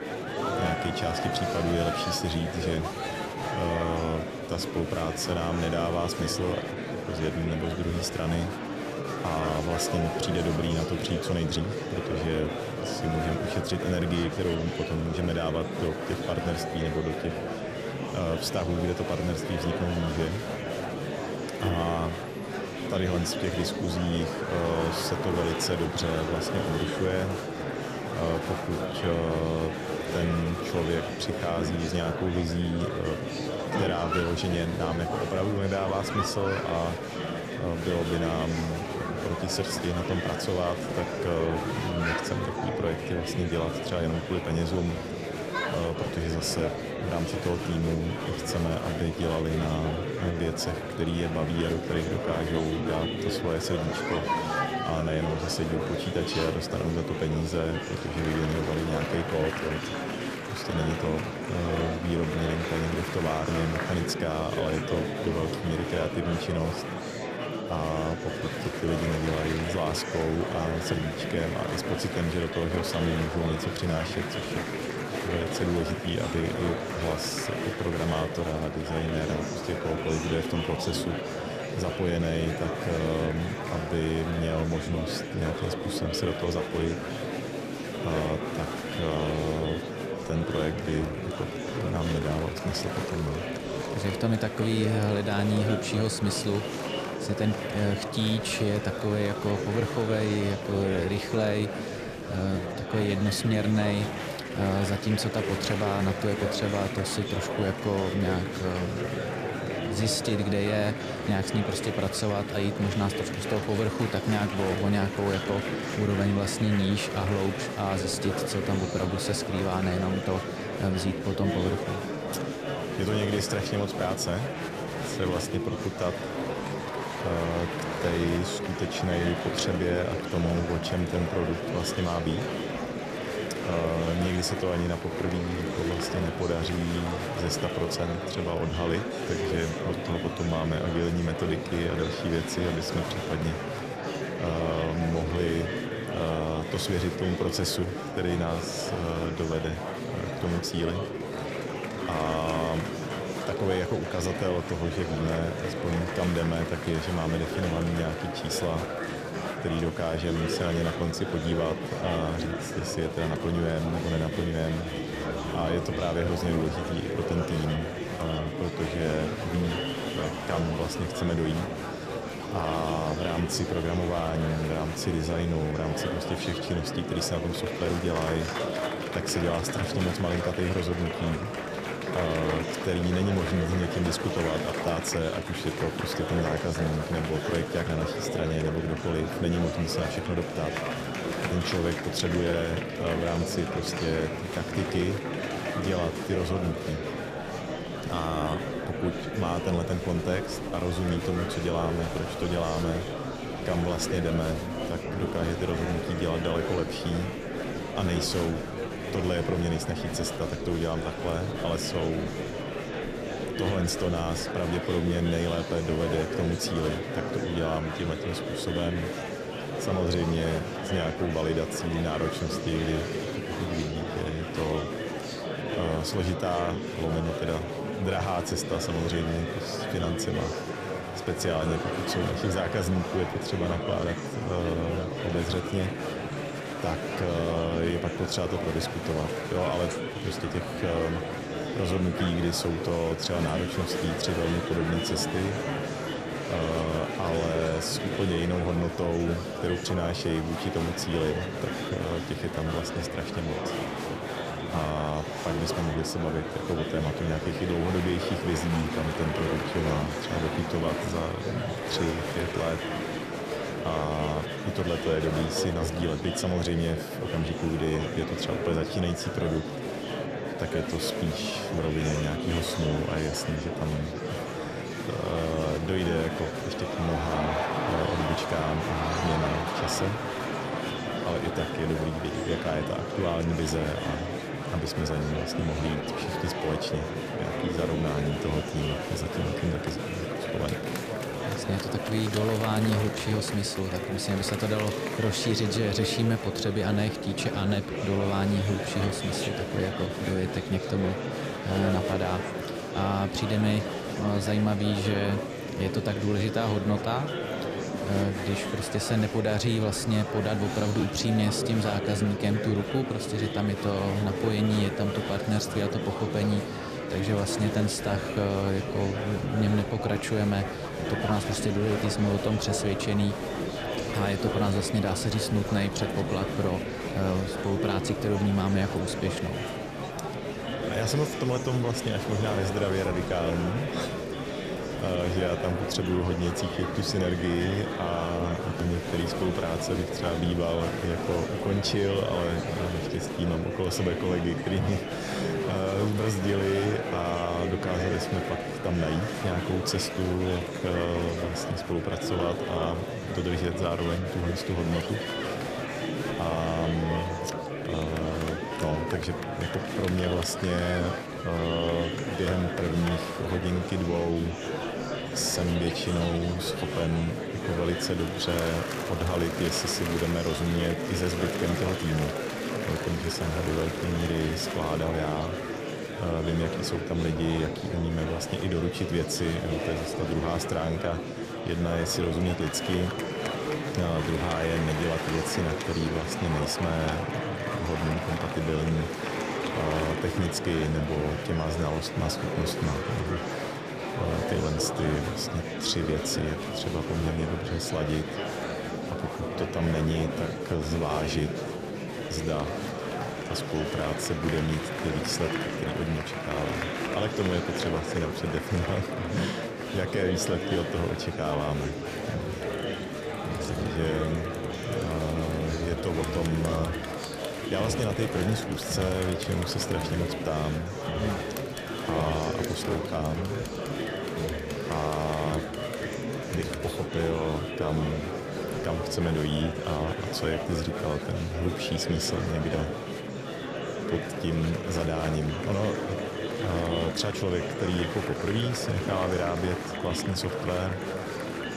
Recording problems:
murmuring crowd; loud; throughout; 2 dB below the speech

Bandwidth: 14.5 kHz